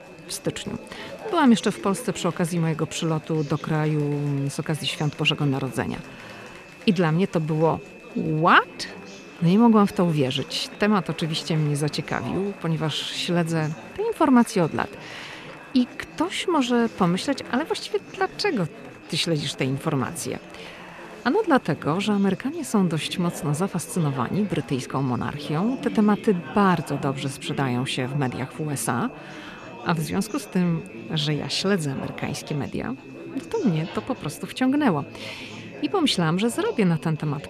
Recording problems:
chatter from many people; noticeable; throughout; 15 dB below the speech
high-pitched whine; faint; throughout; 2.5 kHz, 25 dB below the speech

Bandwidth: 13.5 kHz